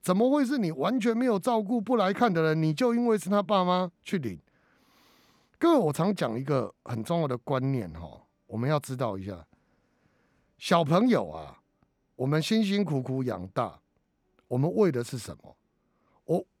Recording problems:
none

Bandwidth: 18.5 kHz